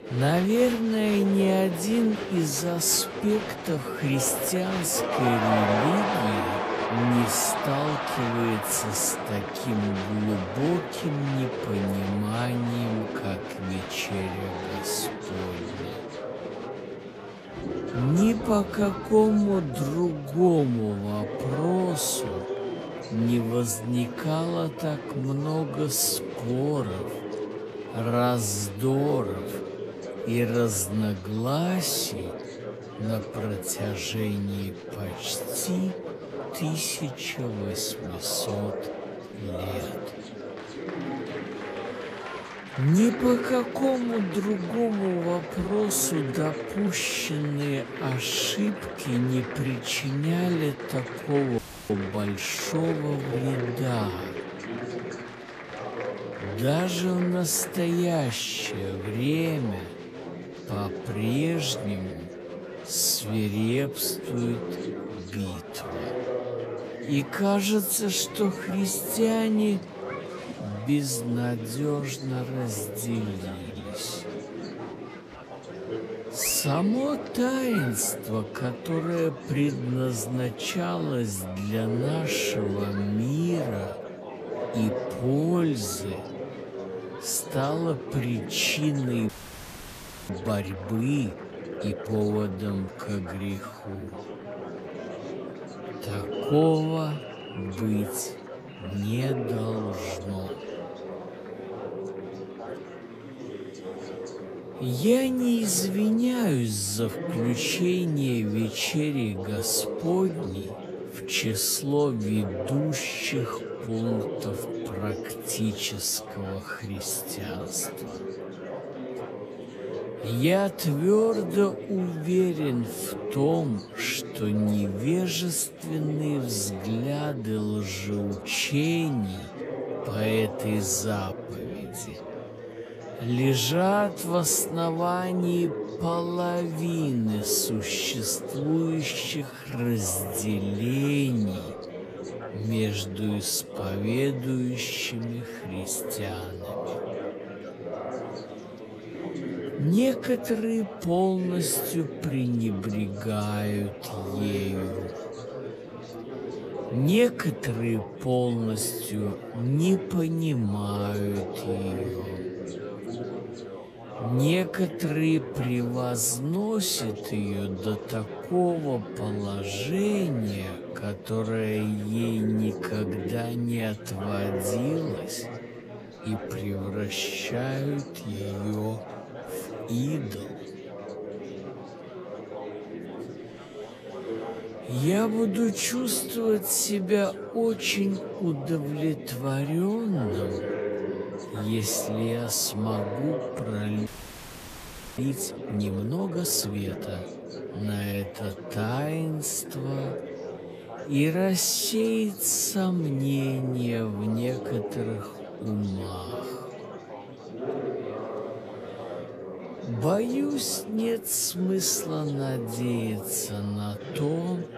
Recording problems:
wrong speed, natural pitch; too slow; 0.6 times normal speed
chatter from many people; loud; throughout; 8 dB below the speech
audio freezing; at 52 s, at 1:29 for 1 s and at 3:14 for 1 s

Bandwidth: 14.5 kHz